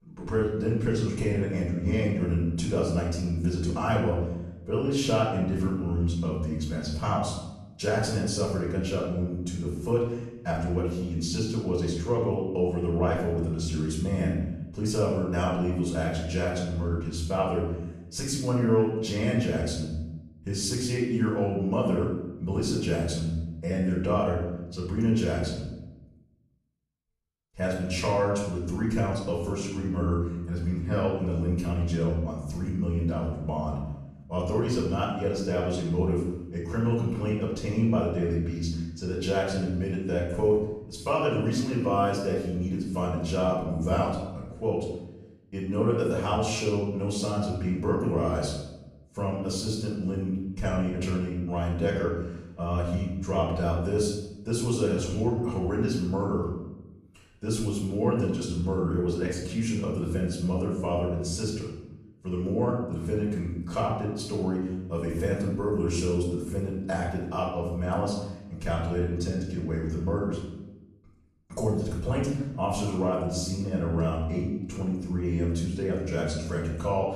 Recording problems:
off-mic speech; far
room echo; noticeable; dies away in 0.9 s

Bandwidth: 14.5 kHz